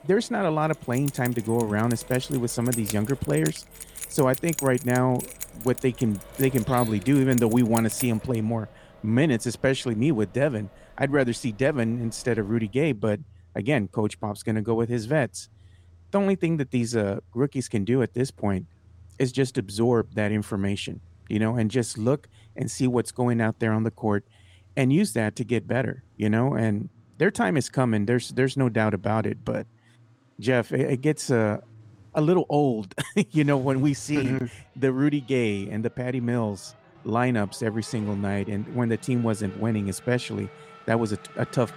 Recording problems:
traffic noise; faint; throughout; 25 dB below the speech
jangling keys; noticeable; from 0.5 to 8.5 s; peak 6 dB below the speech

